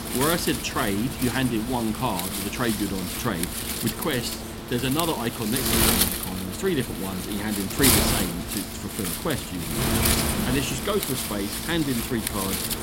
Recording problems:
wind noise on the microphone; heavy; 1 dB above the speech

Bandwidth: 16 kHz